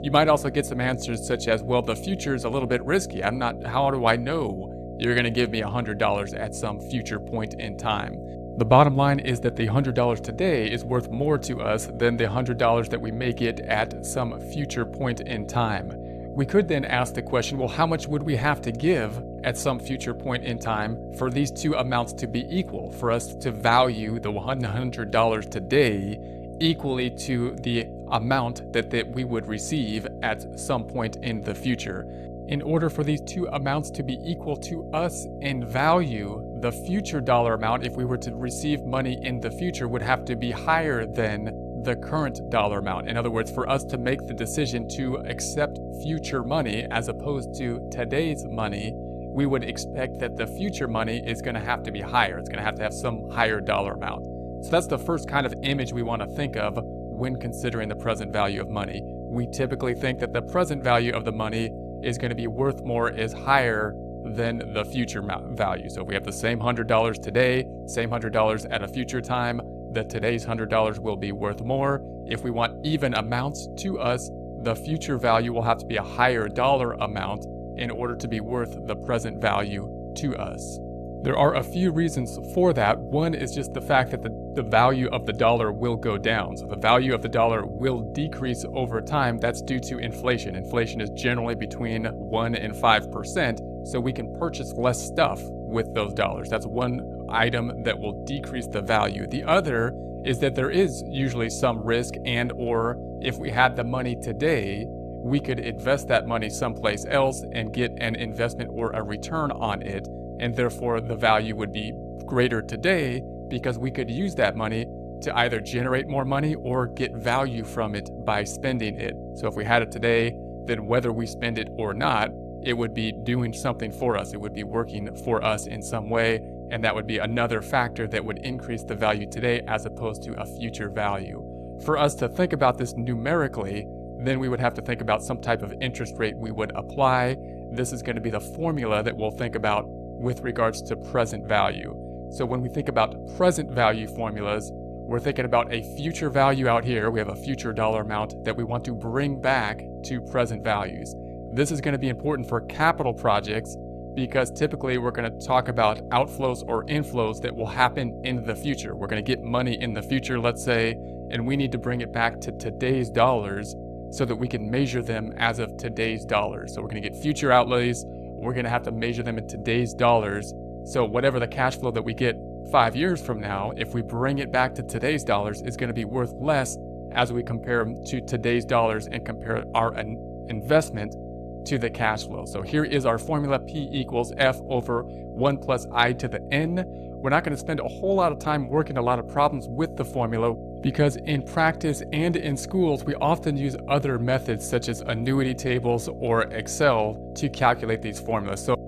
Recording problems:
electrical hum; noticeable; throughout; 60 Hz, 15 dB below the speech

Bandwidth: 14 kHz